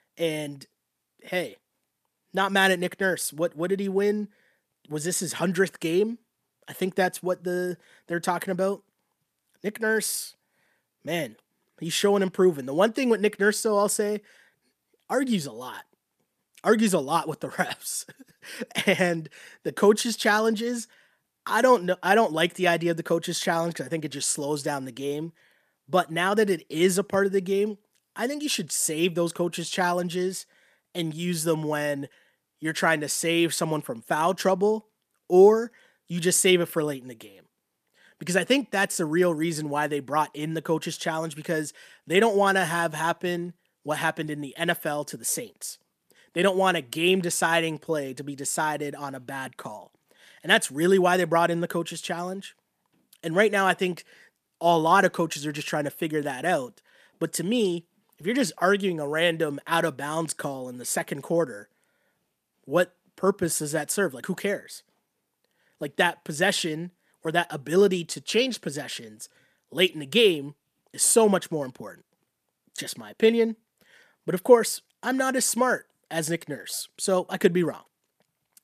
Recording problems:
none

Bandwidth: 14.5 kHz